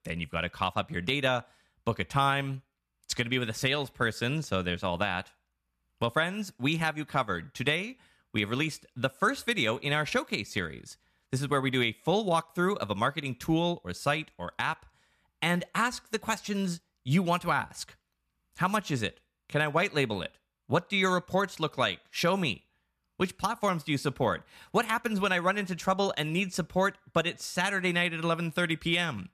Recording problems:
none

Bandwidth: 14 kHz